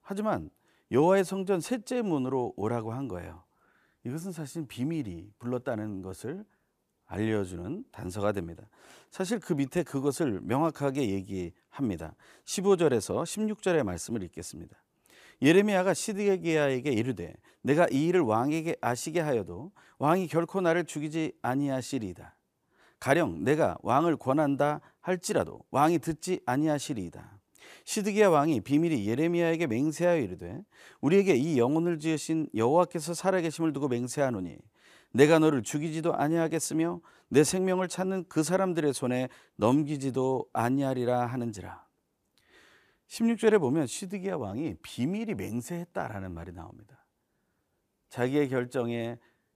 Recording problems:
none

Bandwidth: 15 kHz